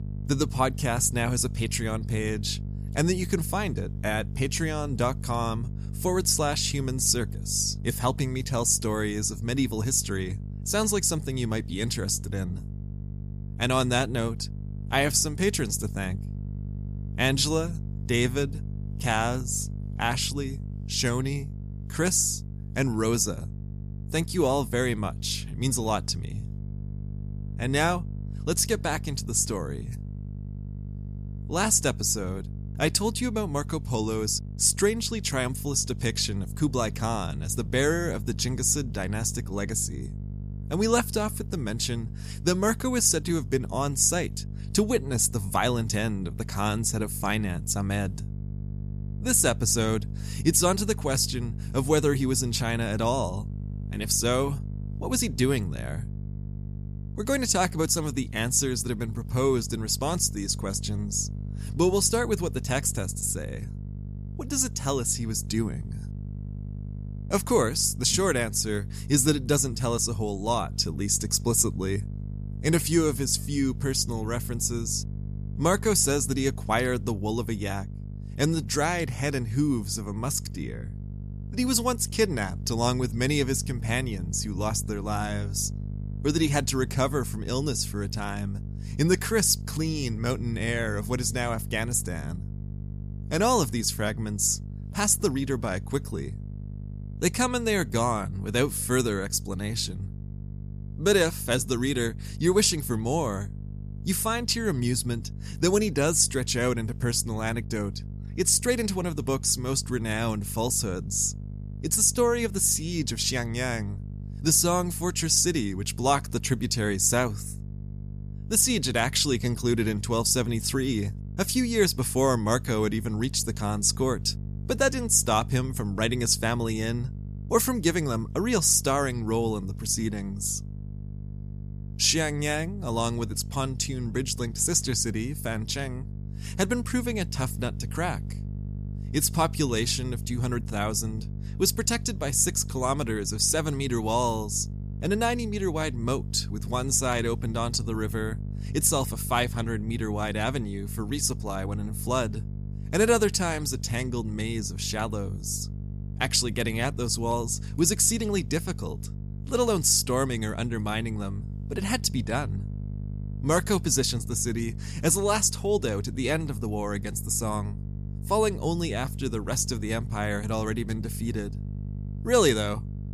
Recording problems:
electrical hum; faint; throughout; 50 Hz, 20 dB below the speech

